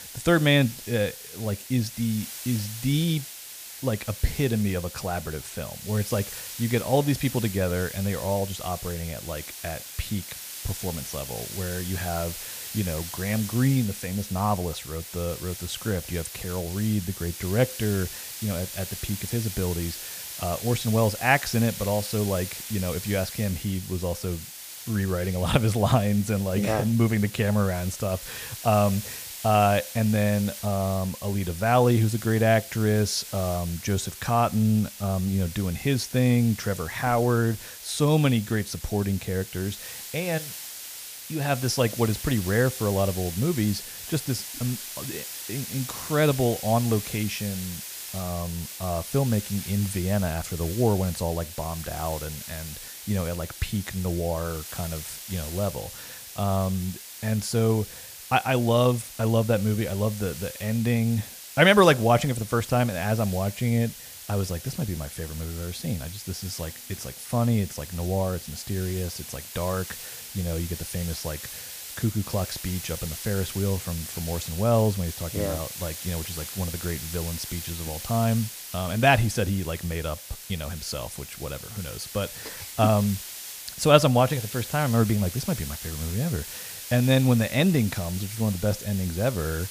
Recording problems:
hiss; loud; throughout; 10 dB below the speech

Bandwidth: 15 kHz